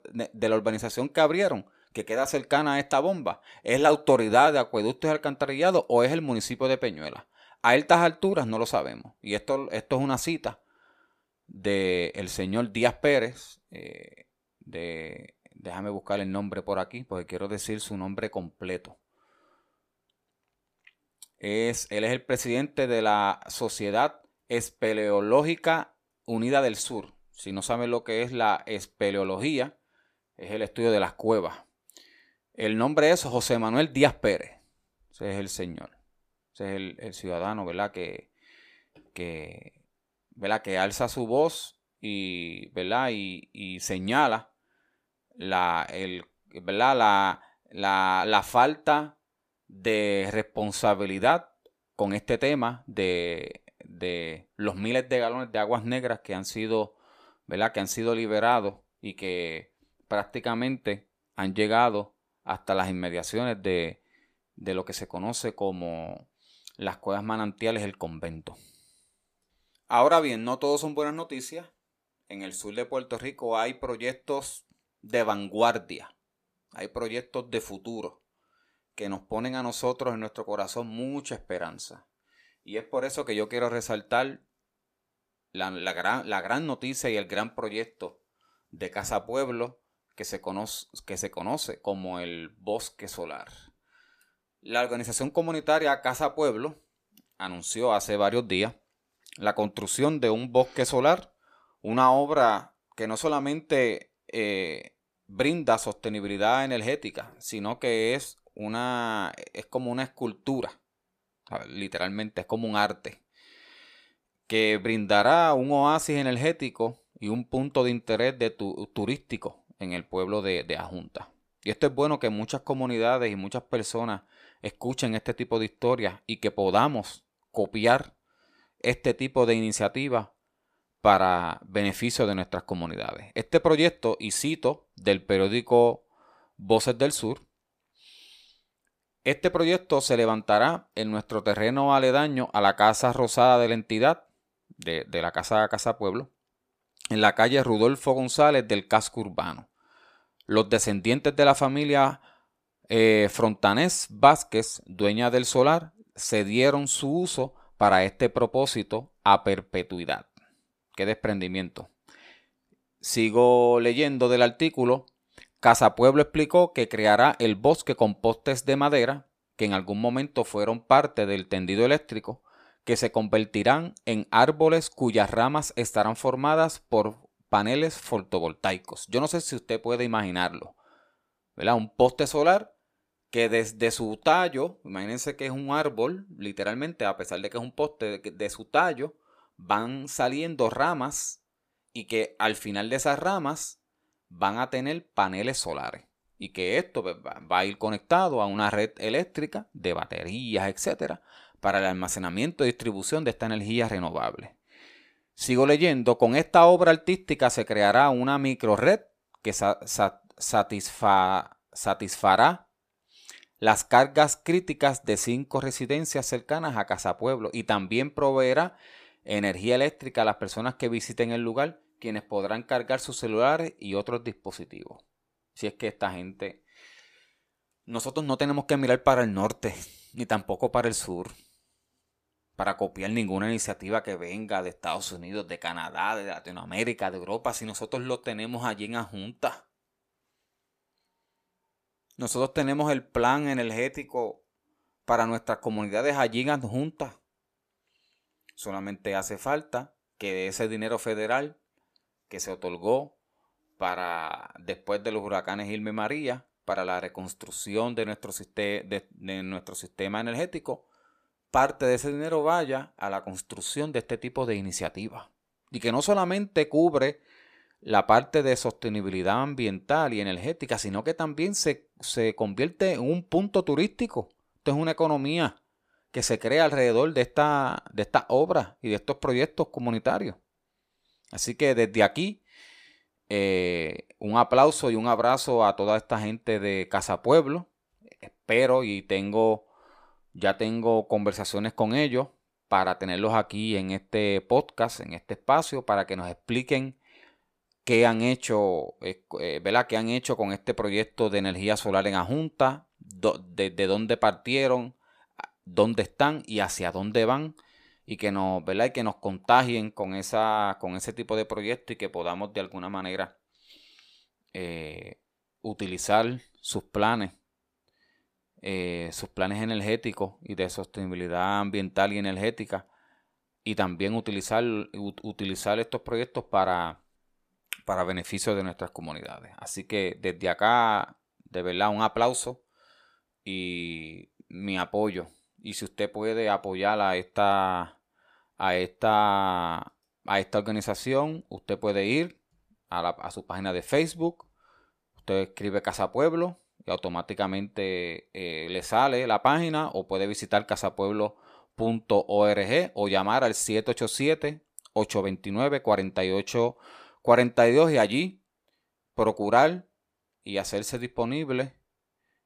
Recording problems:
none

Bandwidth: 14.5 kHz